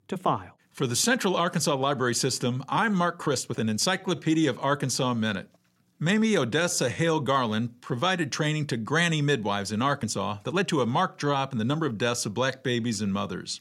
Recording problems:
uneven, jittery; strongly; from 0.5 to 13 s

